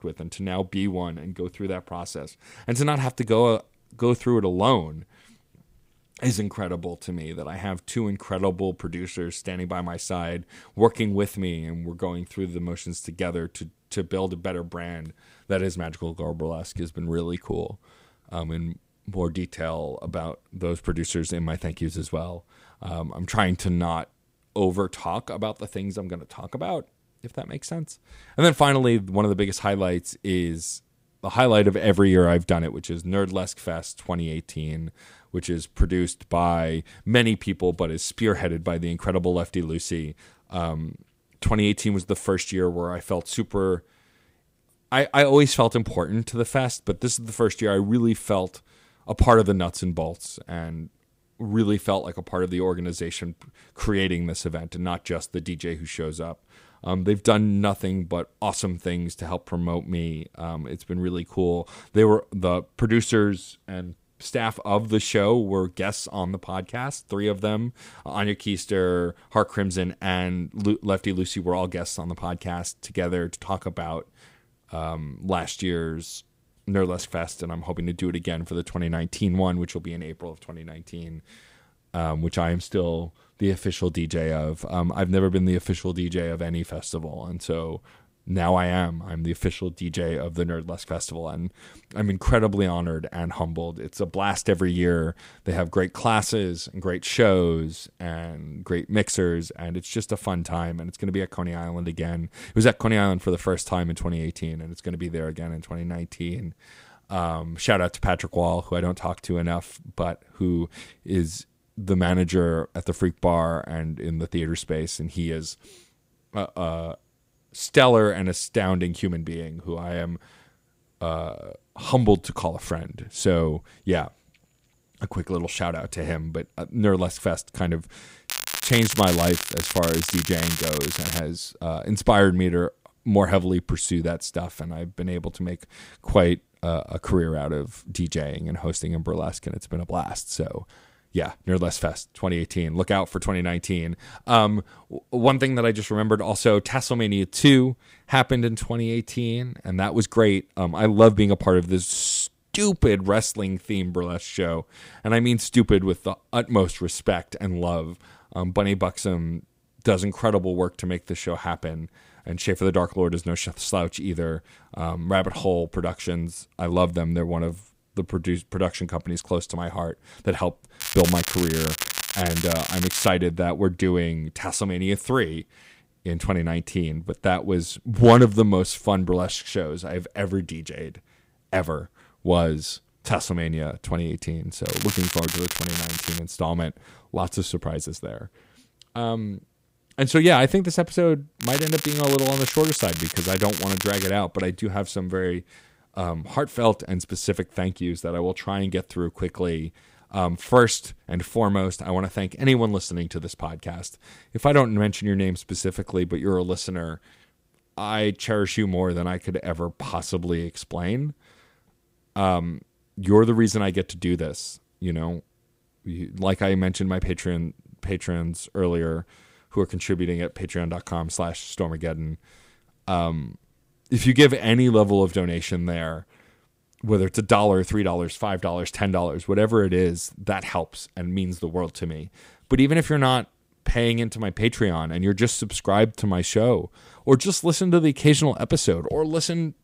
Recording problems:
crackling; loud; 4 times, first at 2:08; 3 dB below the speech

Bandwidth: 15.5 kHz